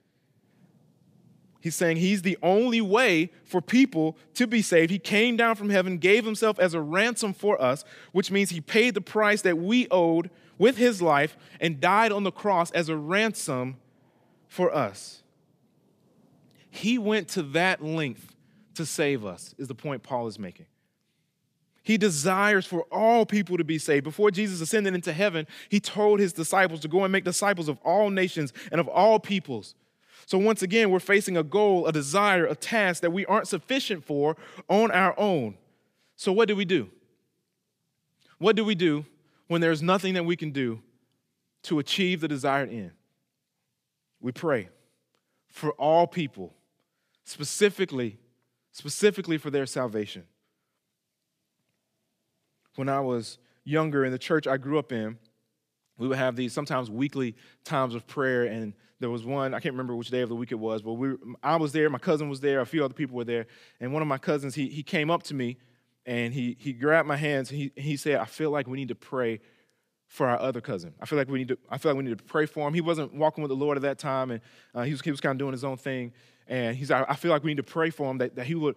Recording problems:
none

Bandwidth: 15 kHz